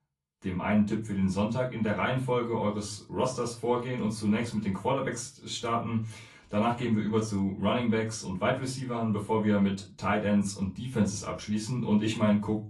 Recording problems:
off-mic speech; far
room echo; very slight; dies away in 0.2 s
garbled, watery; slightly

